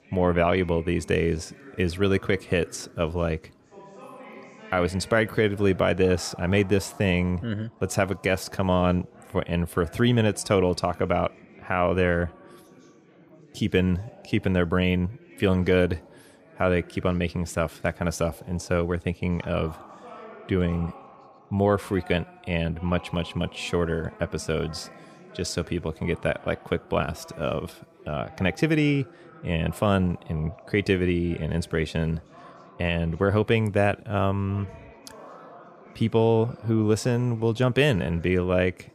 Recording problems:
chatter from many people; faint; throughout; 20 dB below the speech

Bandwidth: 15 kHz